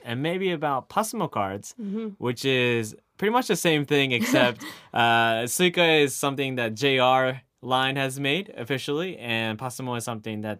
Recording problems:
none

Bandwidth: 15 kHz